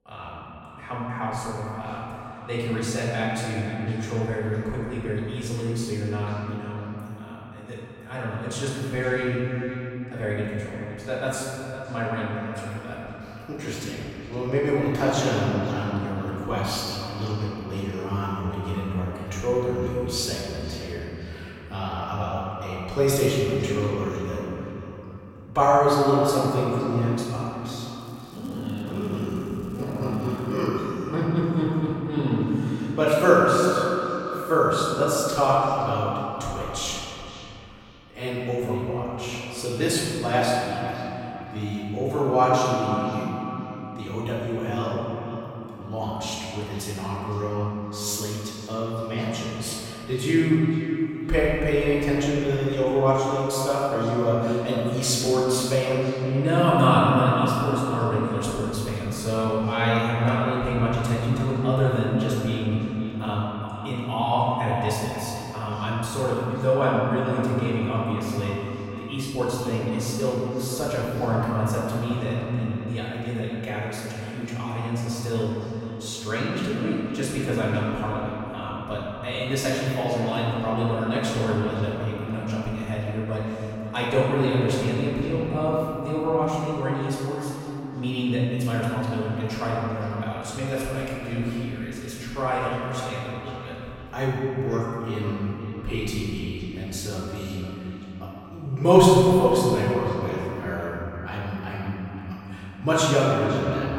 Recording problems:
room echo; strong; dies away in 3 s
off-mic speech; far
echo of what is said; noticeable; throughout; 510 ms later, 15 dB below the speech
crackling; faint; from 28 to 31 s; 30 dB below the speech

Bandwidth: 16 kHz